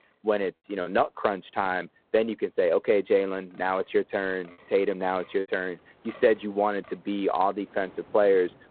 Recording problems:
phone-call audio; poor line; nothing above 4 kHz
wind in the background; faint; throughout; 25 dB below the speech
choppy; occasionally; 2% of the speech affected

